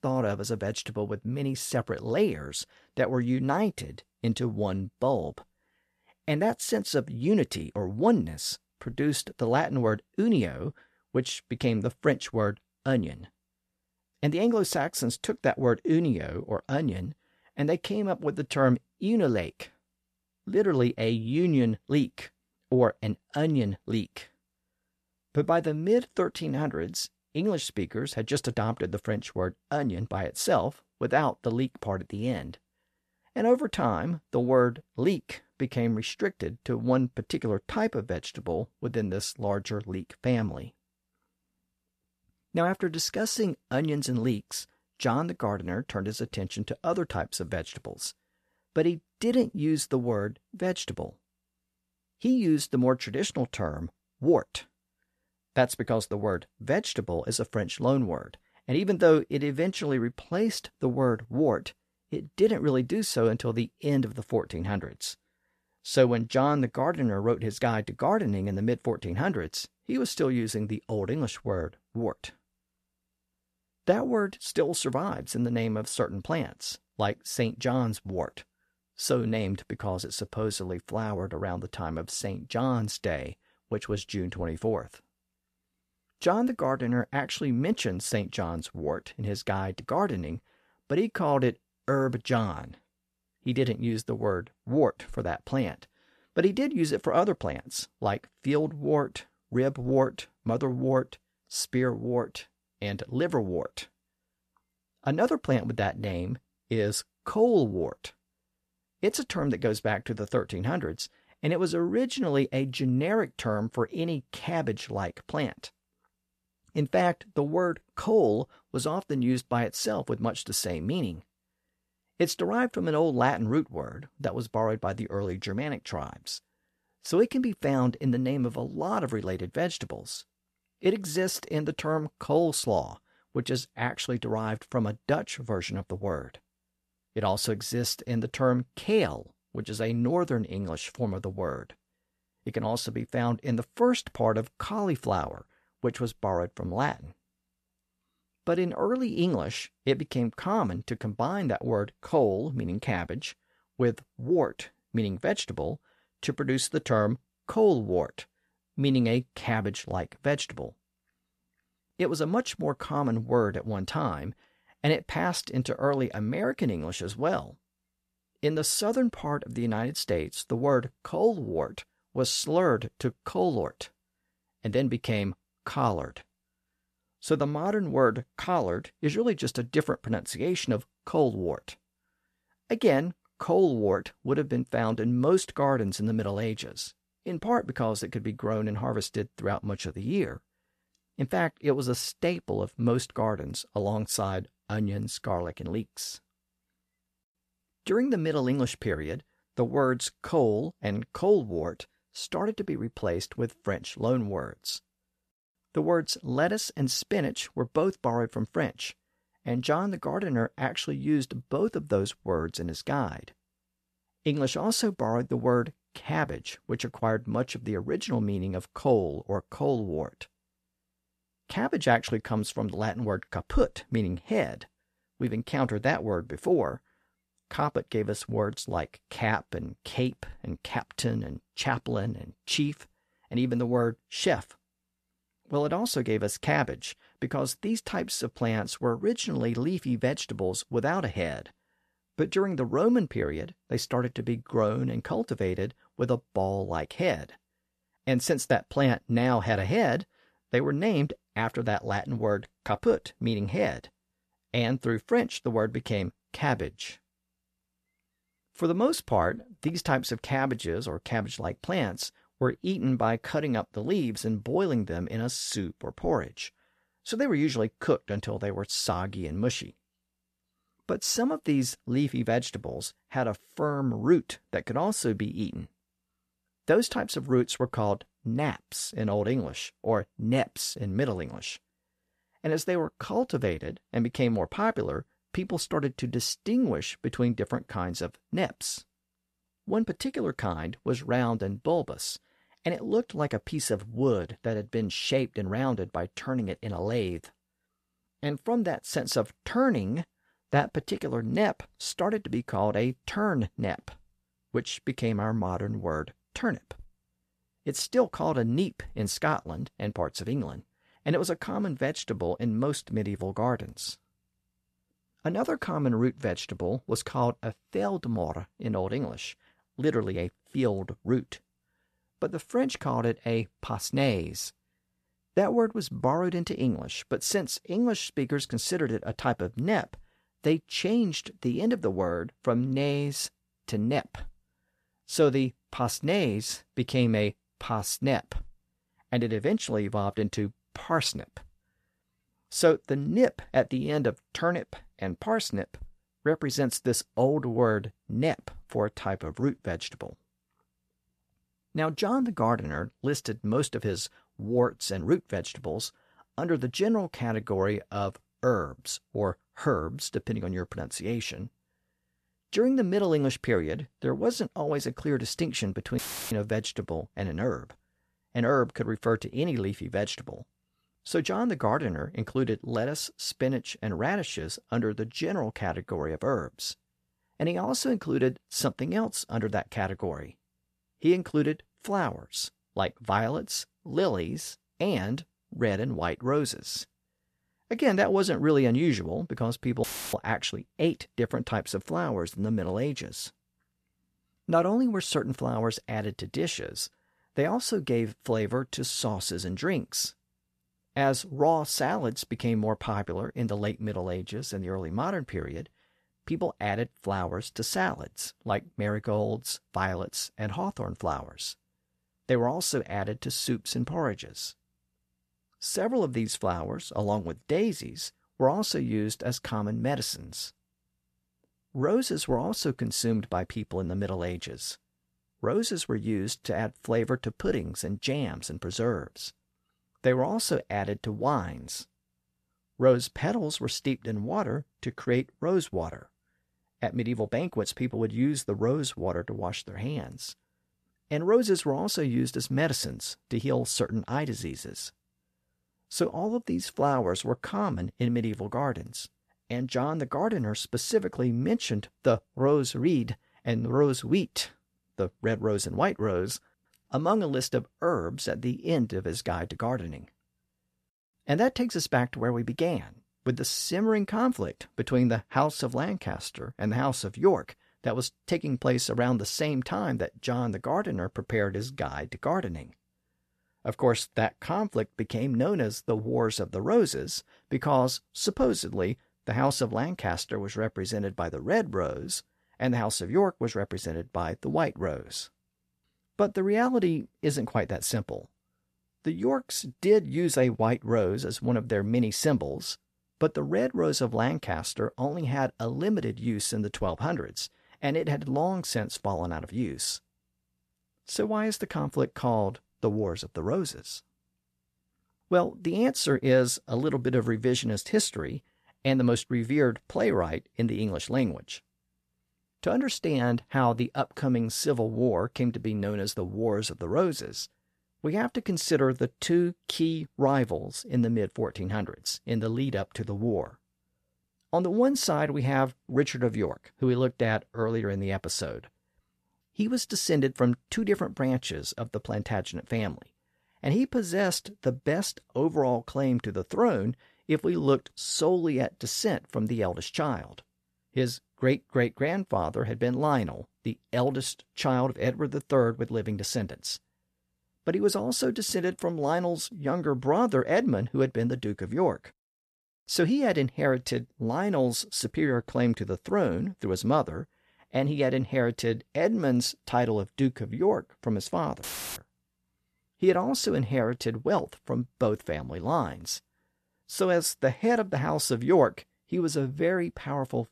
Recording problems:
audio cutting out; filled with static; at 6:06, at 6:30 and at 9:22

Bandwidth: 14 kHz